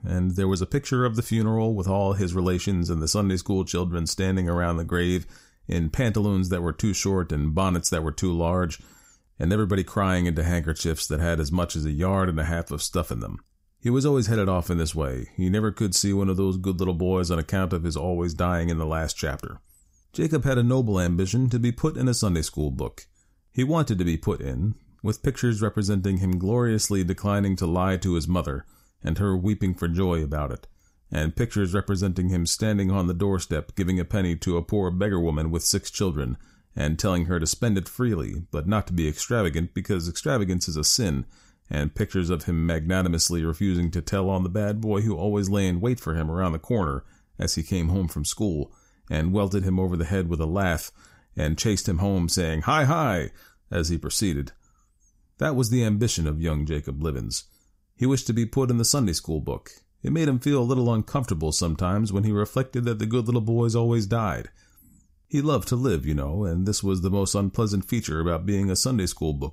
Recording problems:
none

